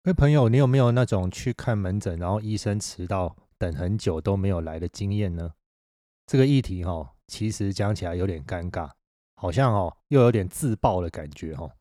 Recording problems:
none

